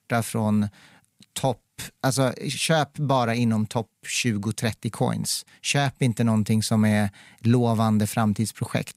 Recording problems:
none

